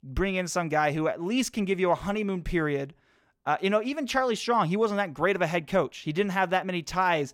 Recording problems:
none

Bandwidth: 17 kHz